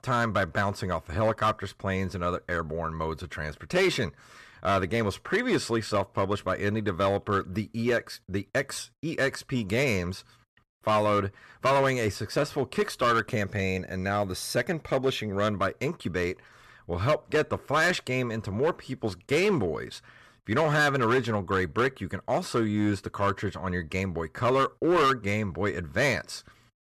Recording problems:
distortion; slight; 5% of the sound clipped

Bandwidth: 13.5 kHz